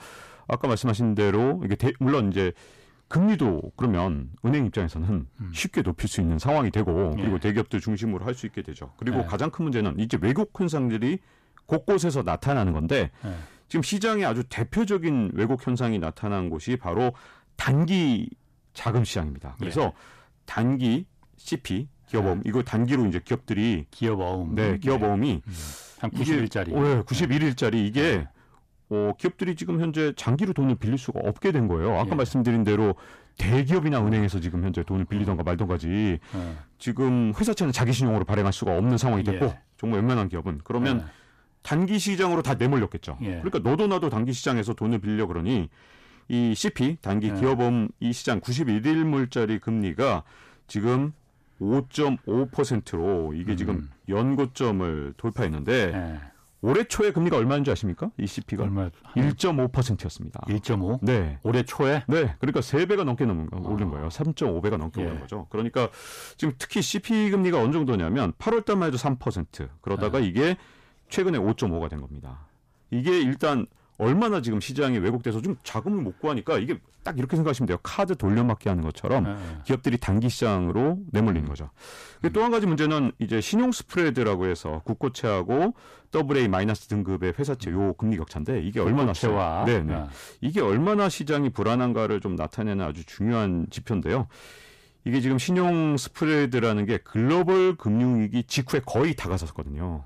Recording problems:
distortion; slight; 10 dB below the speech

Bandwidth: 14.5 kHz